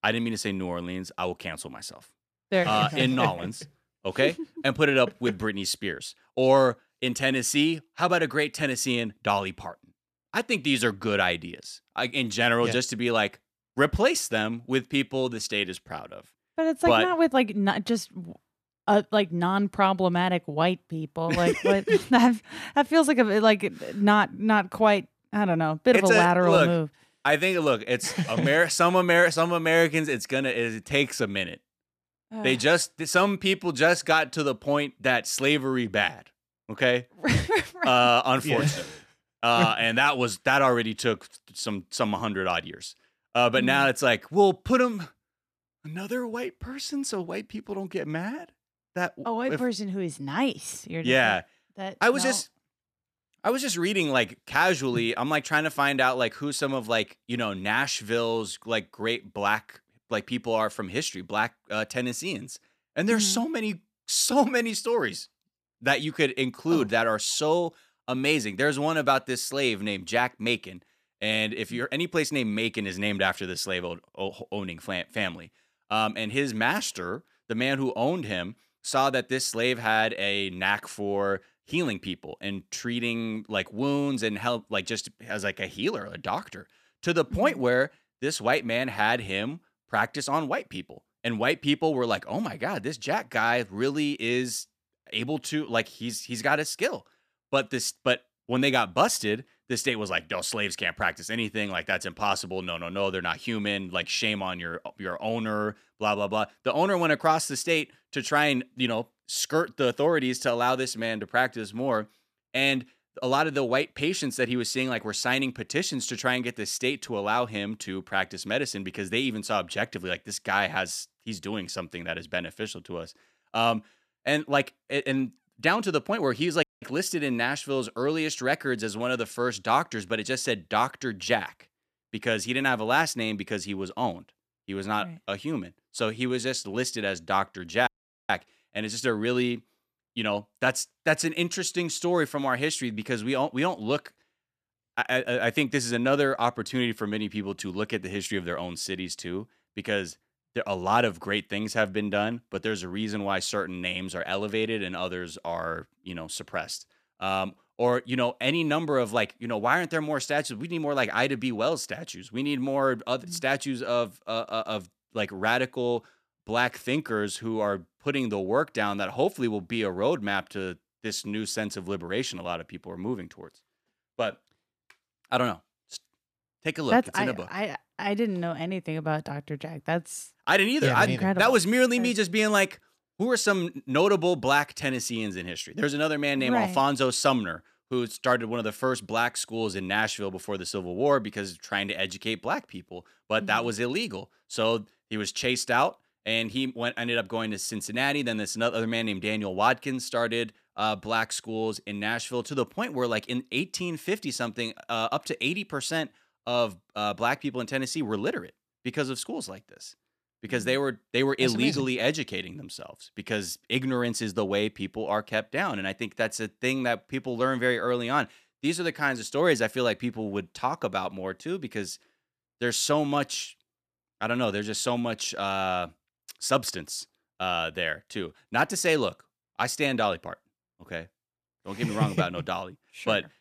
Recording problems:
audio cutting out; at 2:07 and at 2:18

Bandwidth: 14.5 kHz